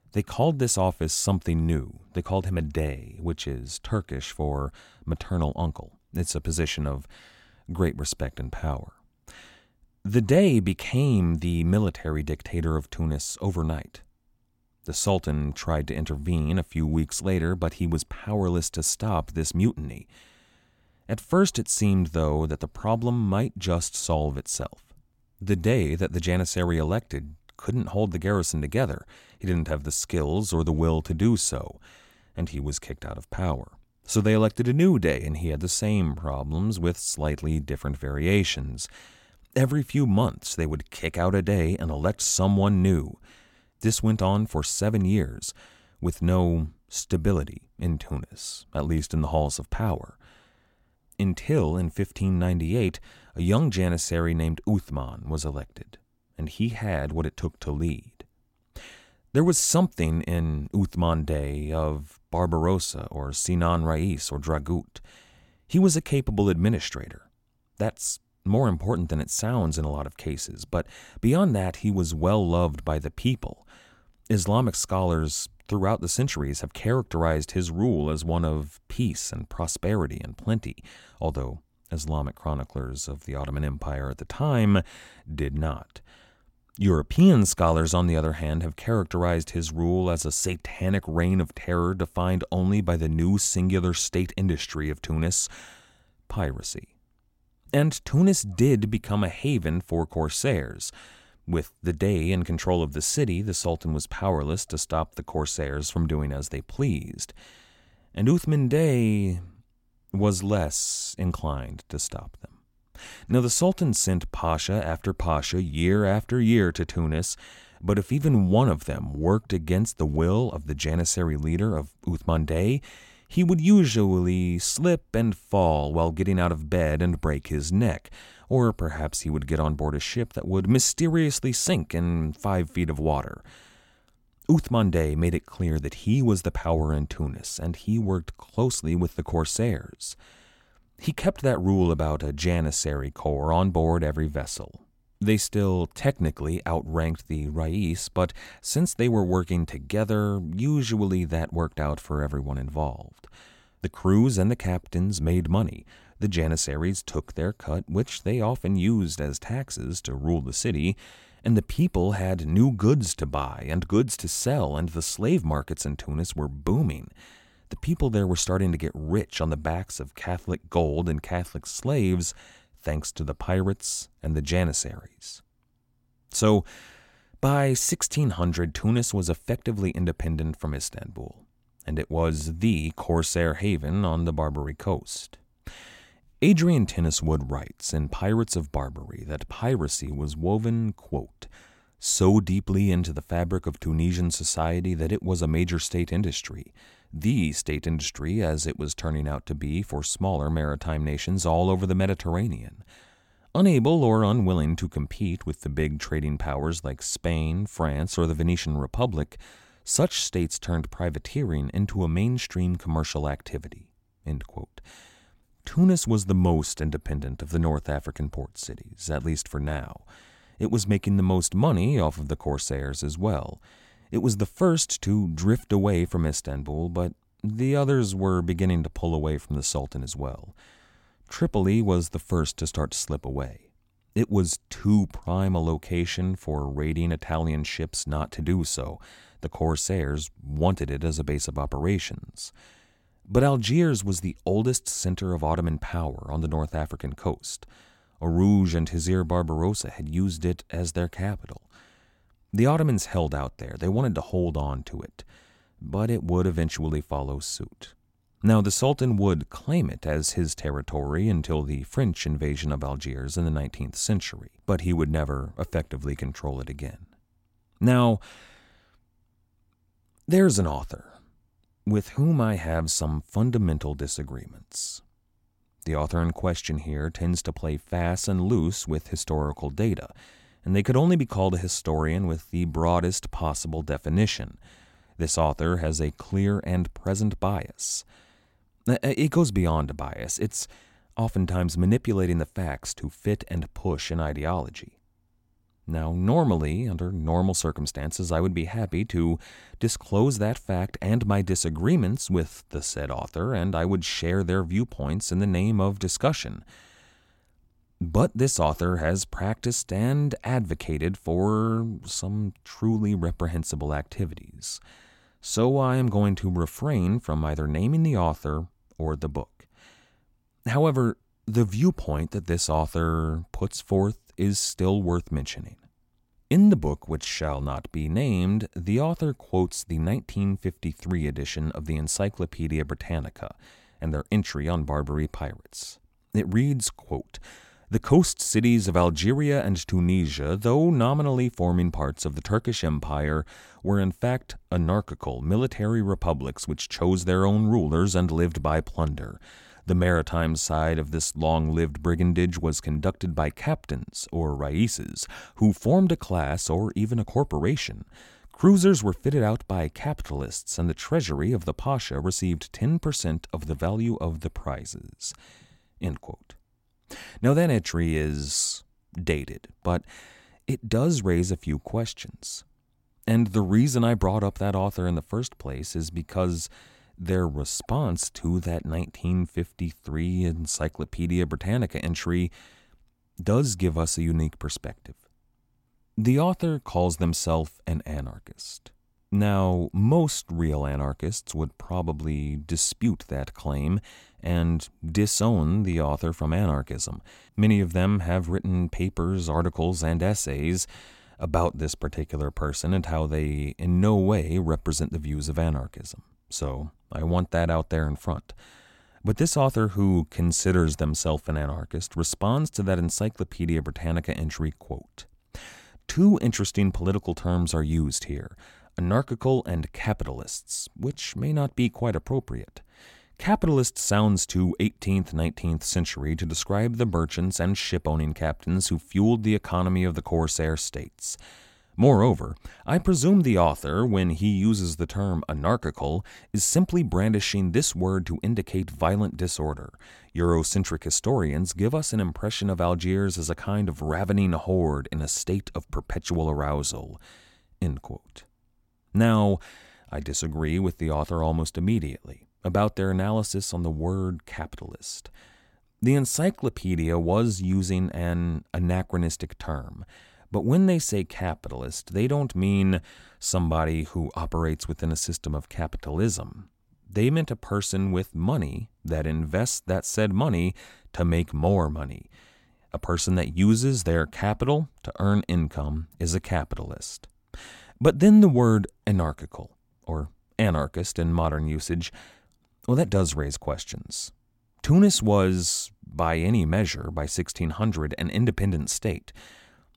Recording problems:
none

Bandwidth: 16.5 kHz